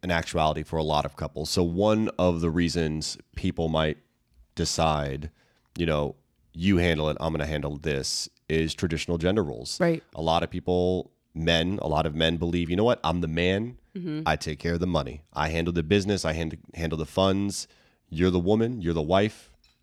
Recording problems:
none

